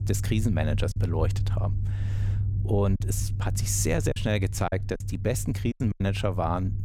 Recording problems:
low rumble; noticeable; throughout; 15 dB below the speech
choppy; very; 6% of the speech affected

